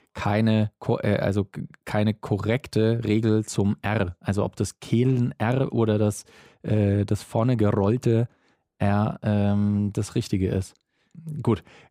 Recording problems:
none

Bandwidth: 15.5 kHz